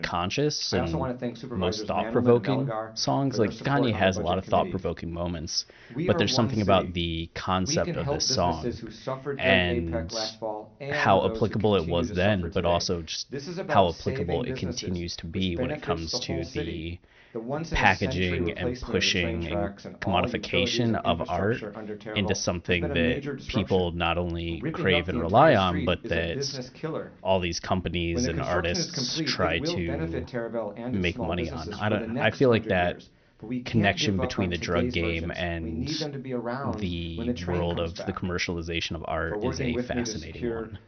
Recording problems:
high frequencies cut off; noticeable; nothing above 6 kHz
voice in the background; loud; throughout; 7 dB below the speech

